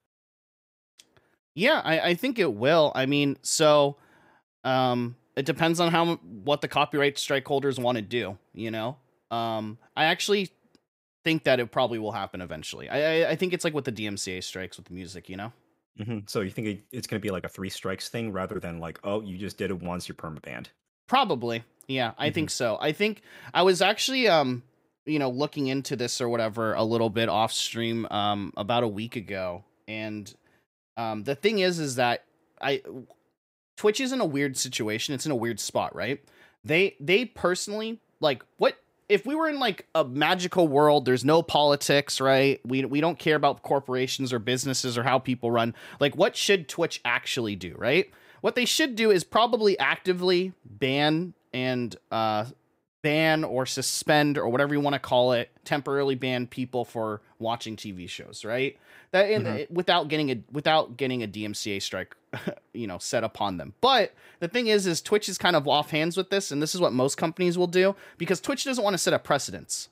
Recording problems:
none

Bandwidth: 15.5 kHz